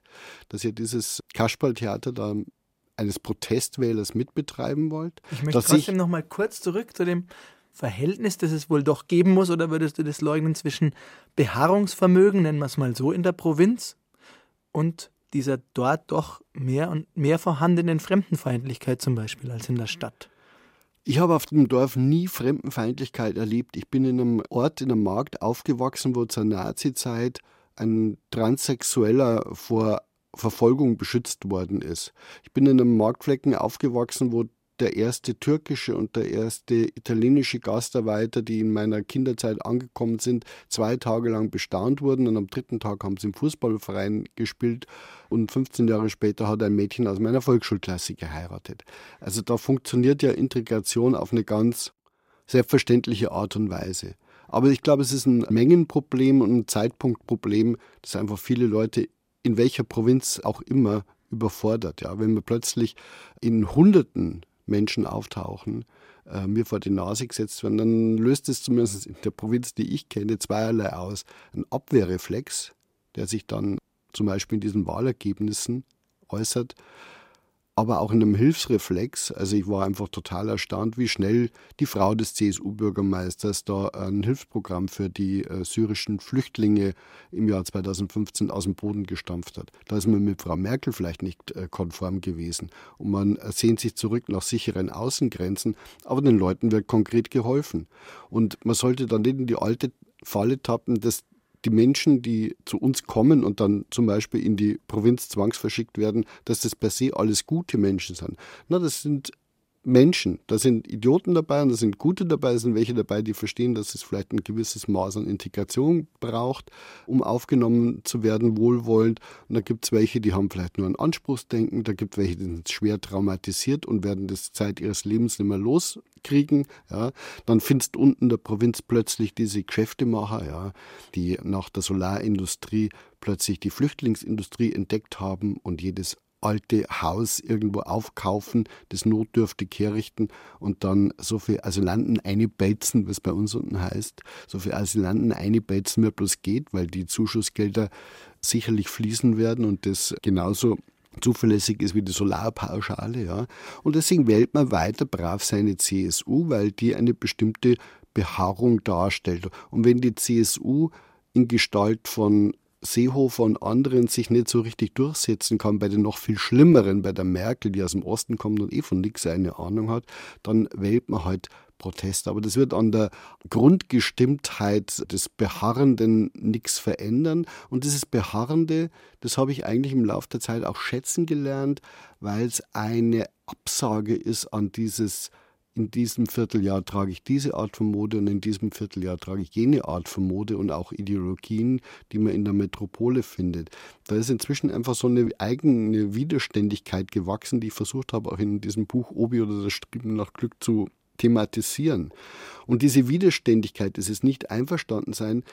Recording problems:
none

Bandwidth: 16 kHz